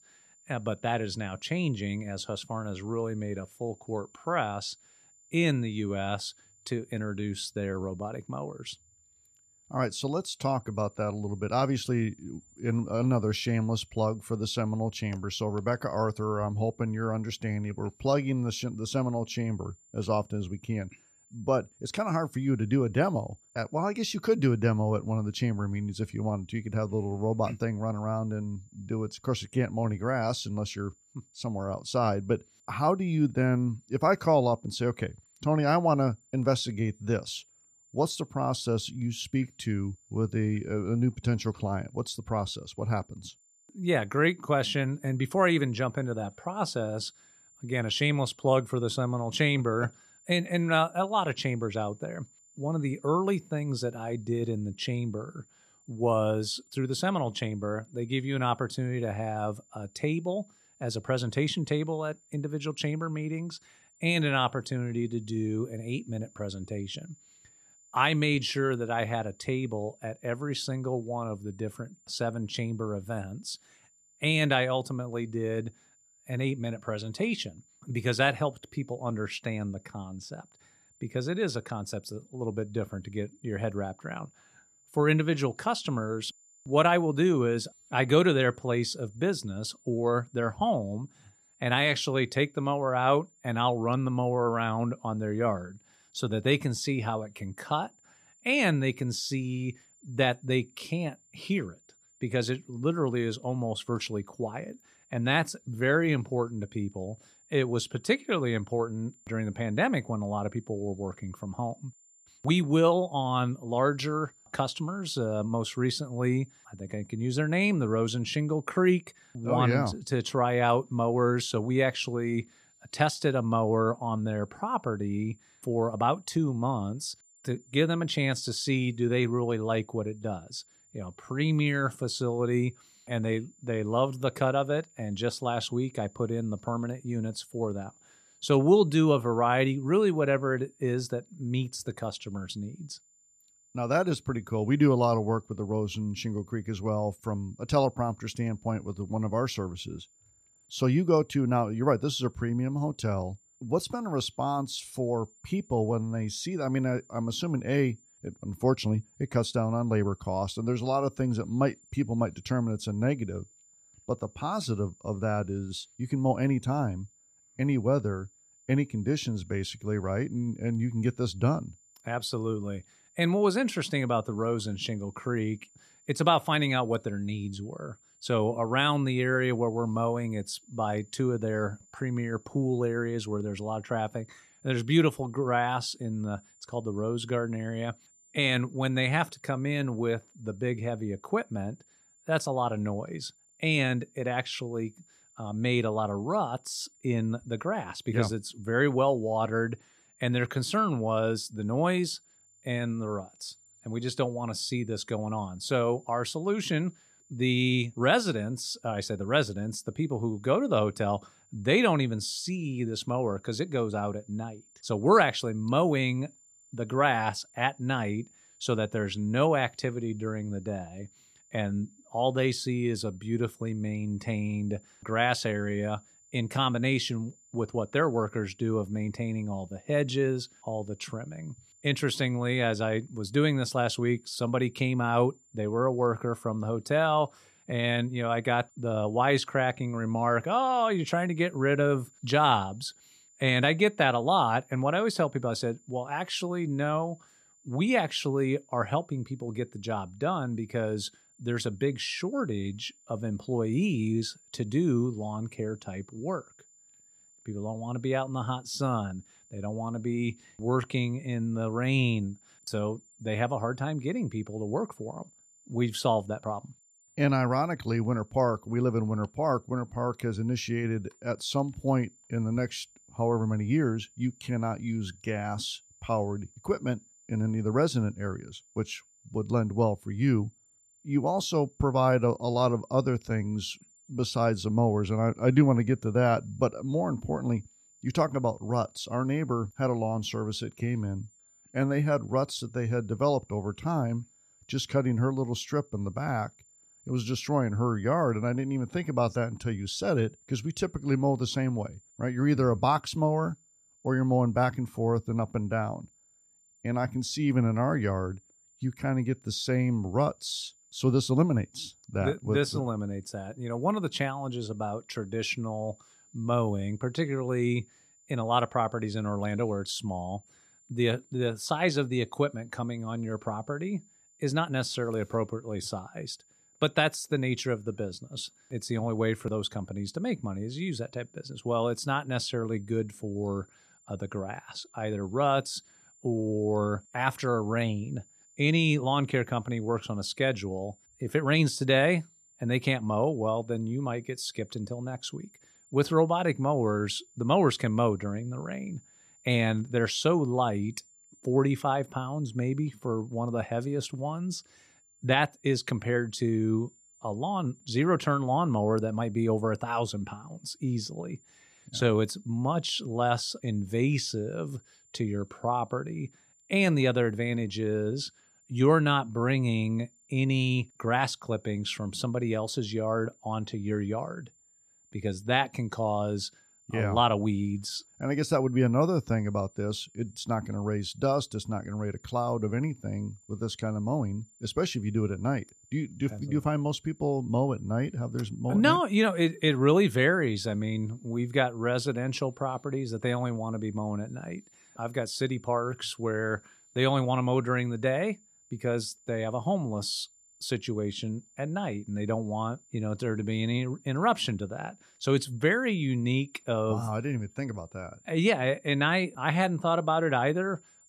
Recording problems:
high-pitched whine; faint; throughout; 7 kHz, 30 dB below the speech

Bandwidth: 14.5 kHz